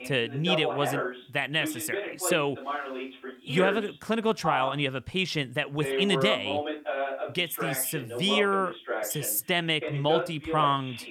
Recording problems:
voice in the background; loud; throughout; 5 dB below the speech

